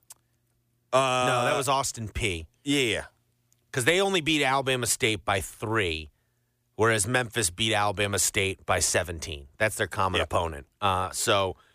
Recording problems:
none

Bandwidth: 15 kHz